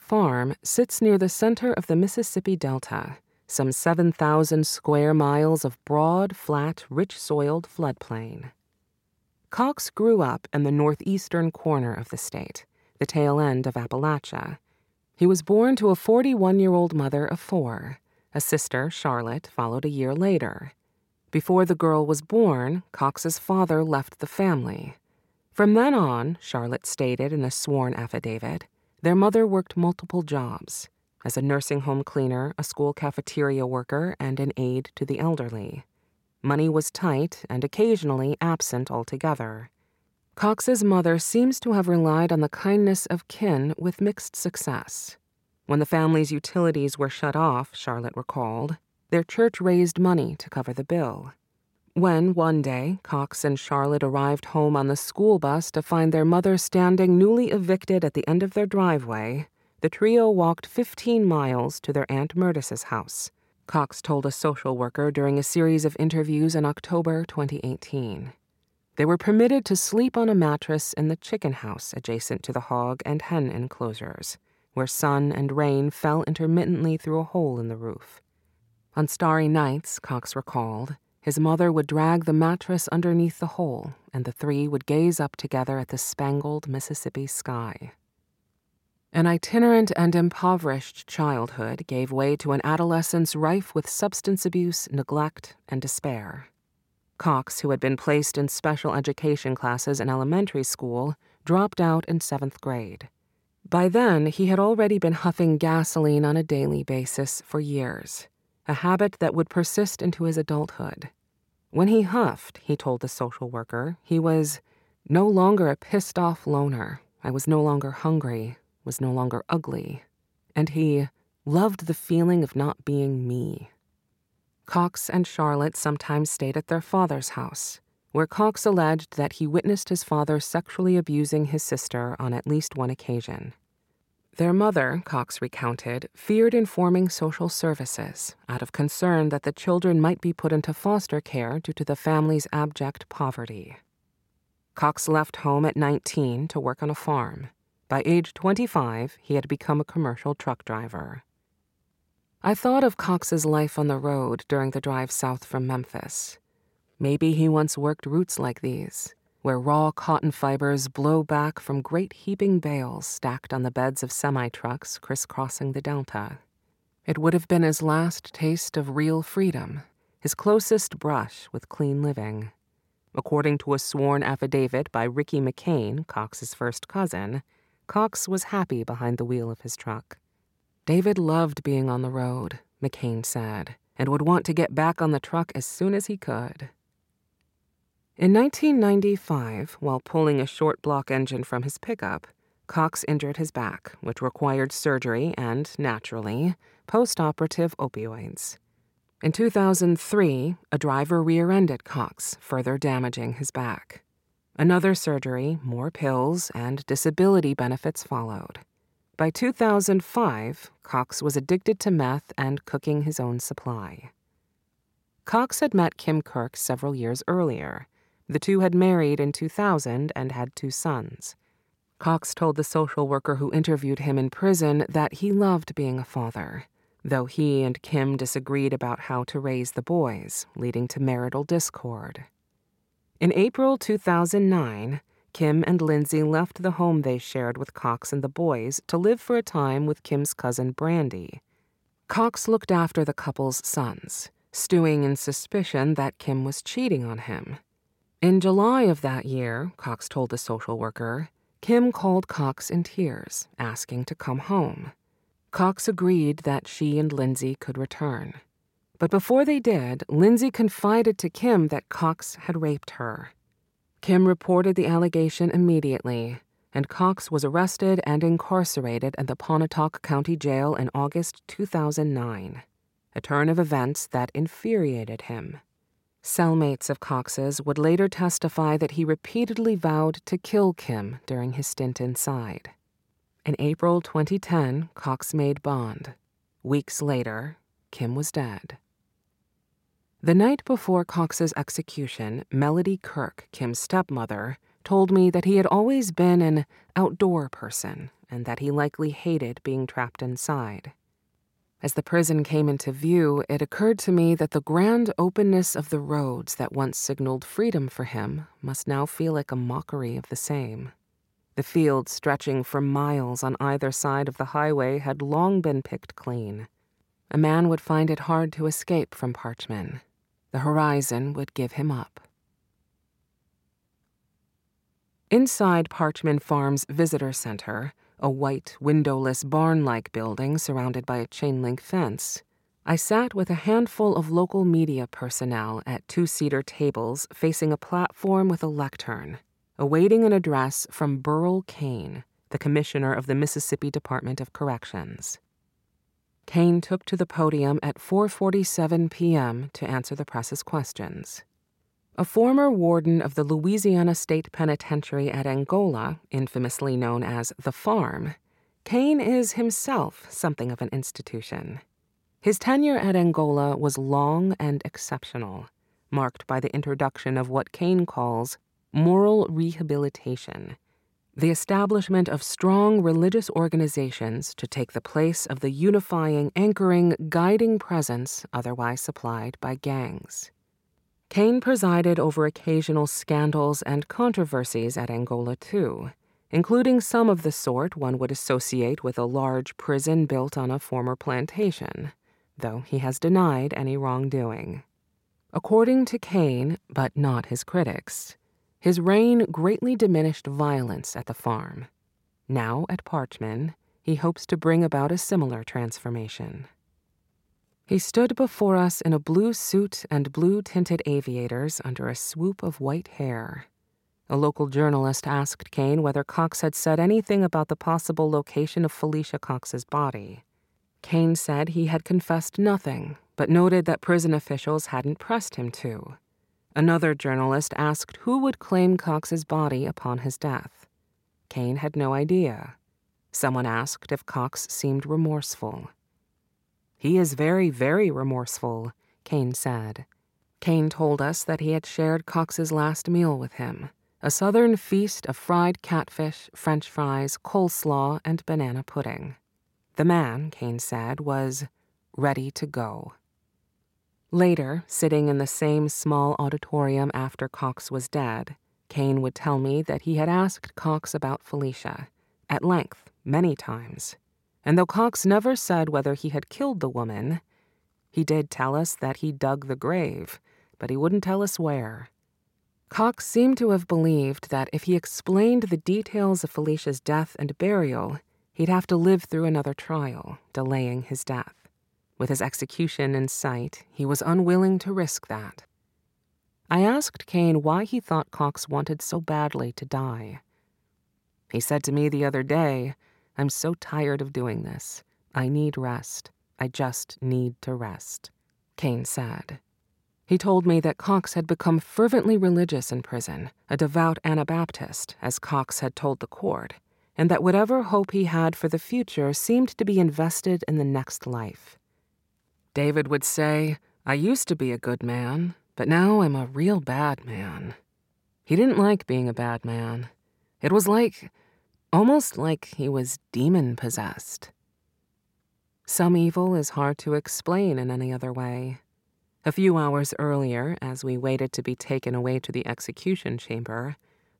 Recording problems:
none

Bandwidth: 16.5 kHz